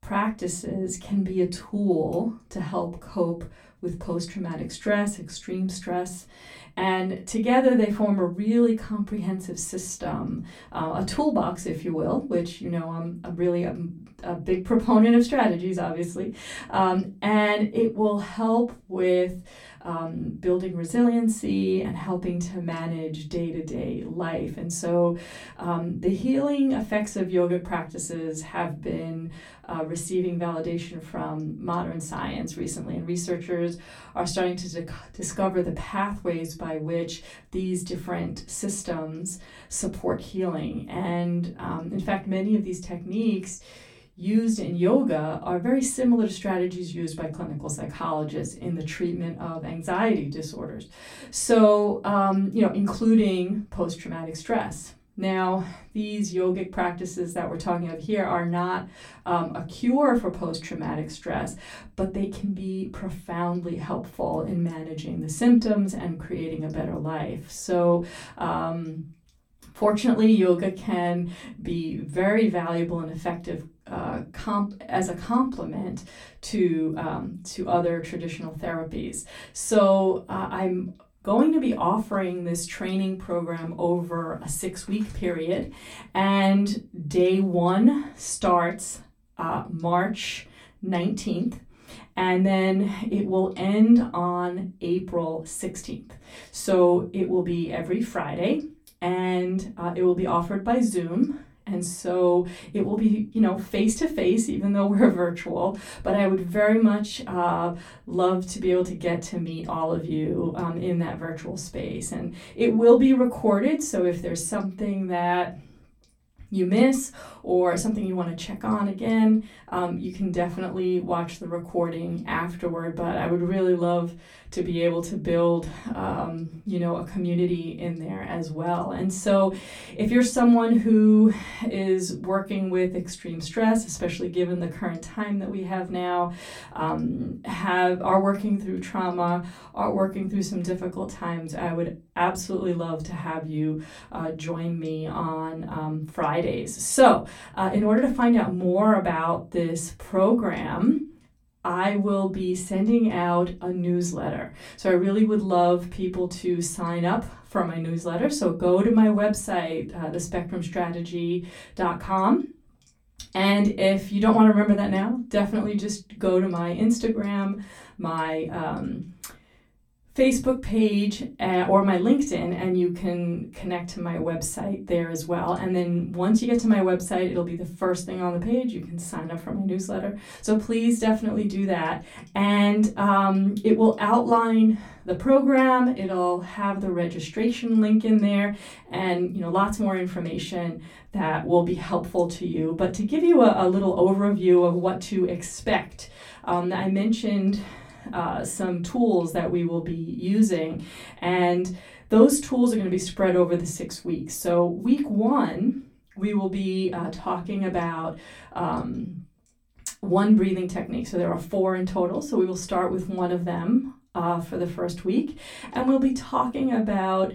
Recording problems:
off-mic speech; far
room echo; very slight; dies away in 0.2 s

